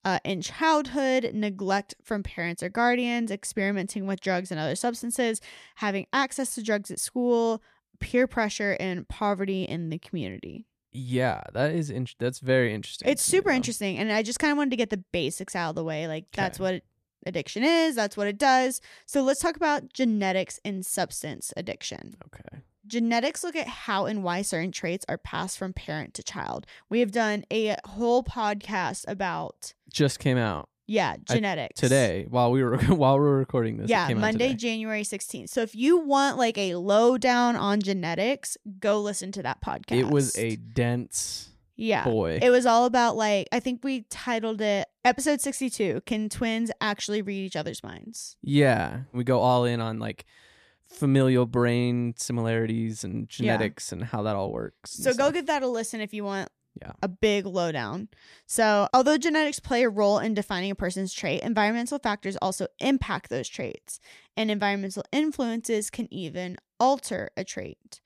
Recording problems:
none

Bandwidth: 14.5 kHz